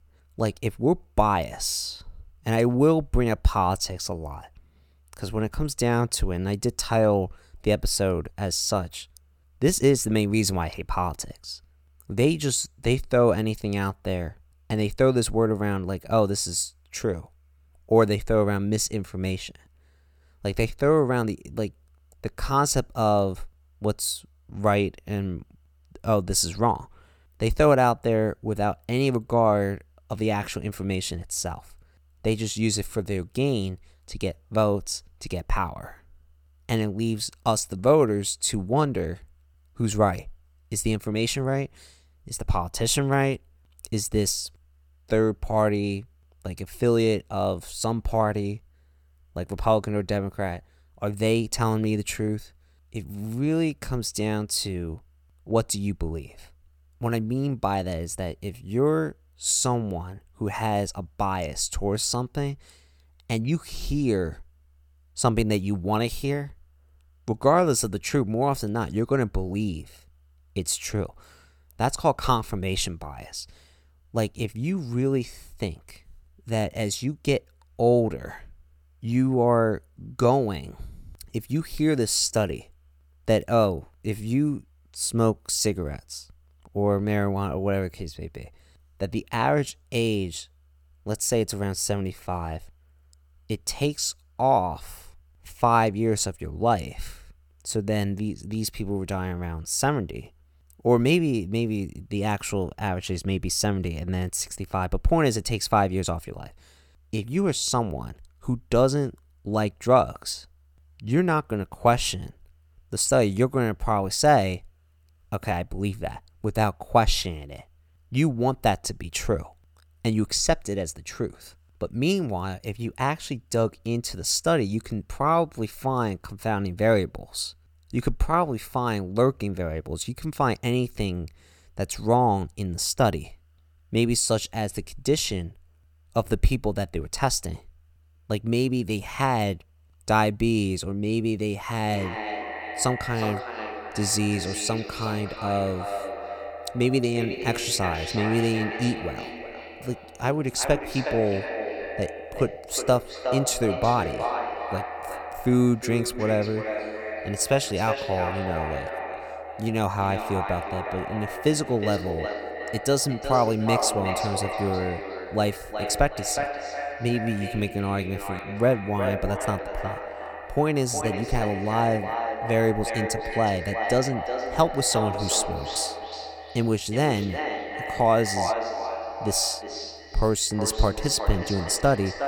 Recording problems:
echo of what is said; strong; from 2:22 on; 360 ms later, 7 dB below the speech

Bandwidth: 17.5 kHz